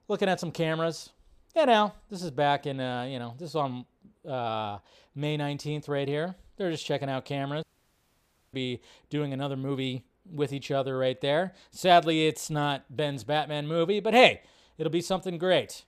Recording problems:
audio cutting out; at 7.5 s for 1 s

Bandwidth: 15 kHz